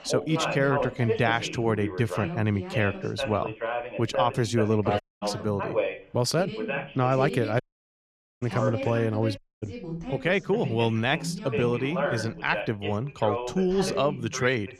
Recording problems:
background chatter; loud; throughout; 2 voices, 5 dB below the speech
audio cutting out; at 5 s, at 7.5 s for 1 s and at 9.5 s

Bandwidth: 14.5 kHz